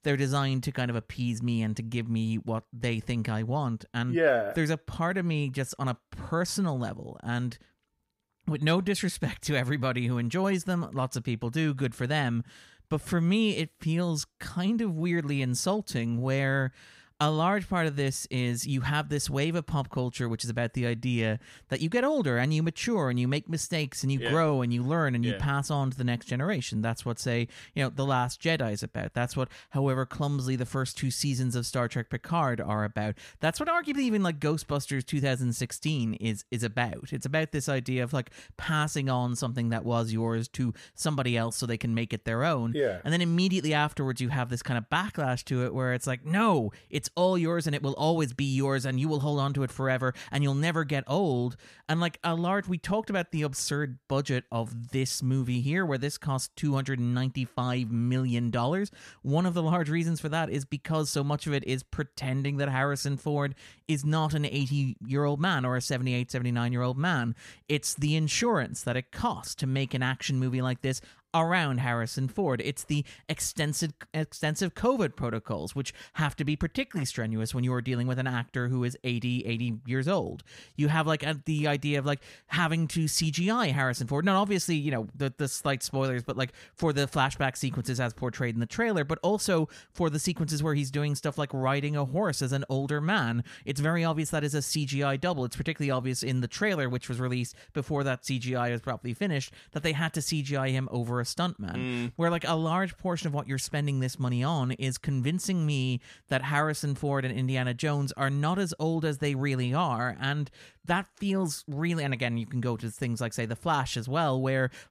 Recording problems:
none

